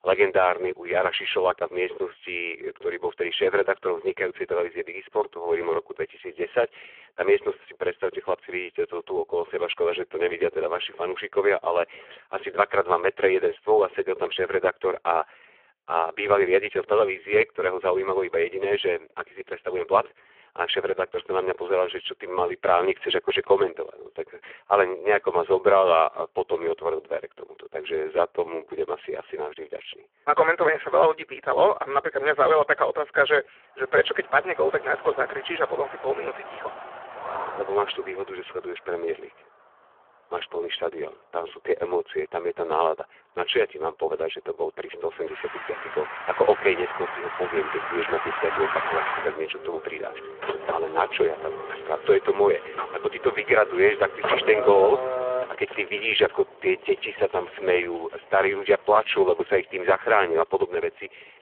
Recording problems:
phone-call audio; poor line
traffic noise; loud; from 34 s on; 8 dB below the speech

